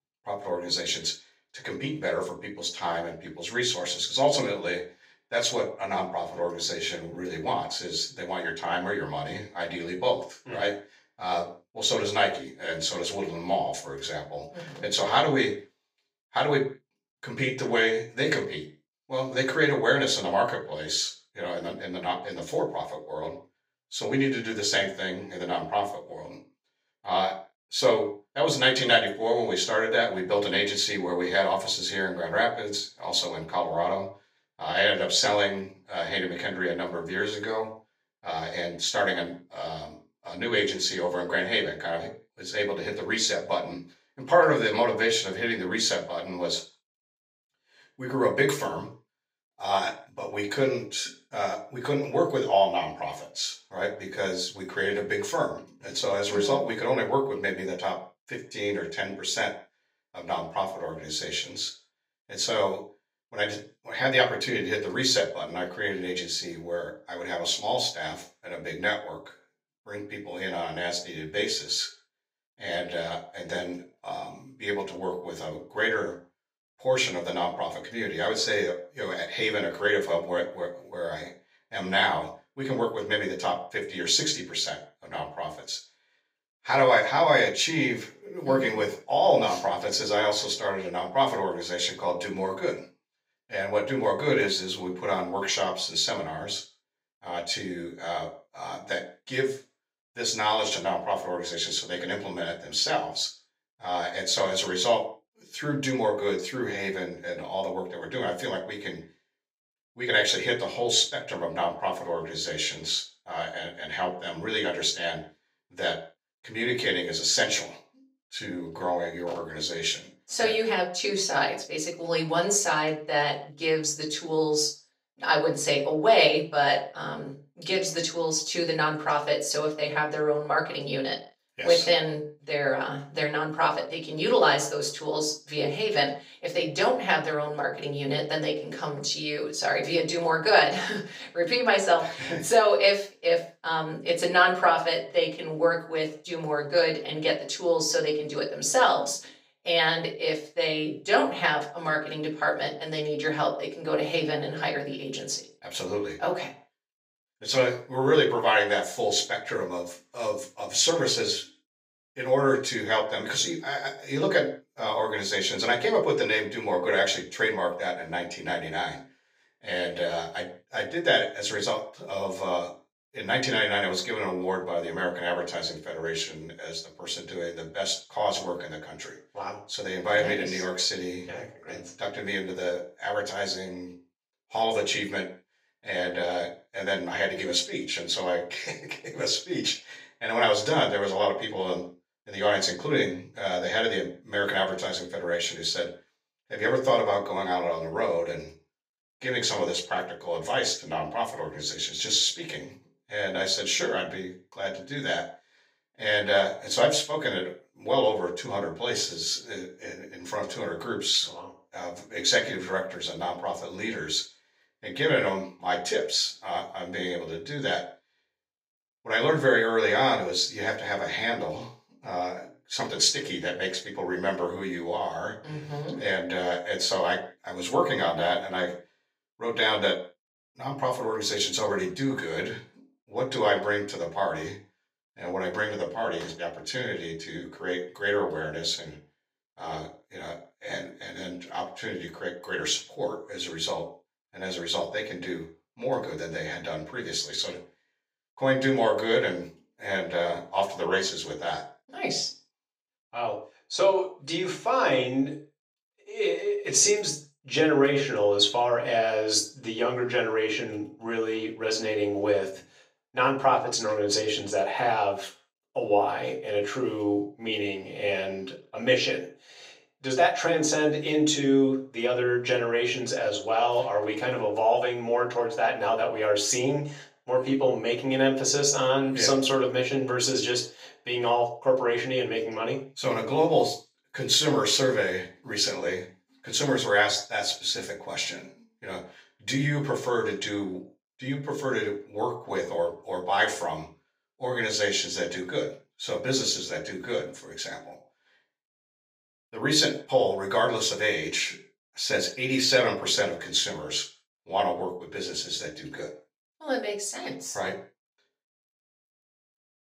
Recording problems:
off-mic speech; far
thin; somewhat; fading below 400 Hz
room echo; slight; dies away in 0.3 s

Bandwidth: 15.5 kHz